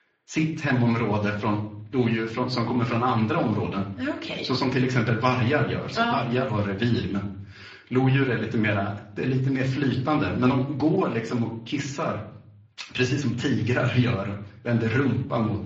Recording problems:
off-mic speech; far
room echo; slight; dies away in 0.4 s
garbled, watery; slightly; nothing above 7 kHz

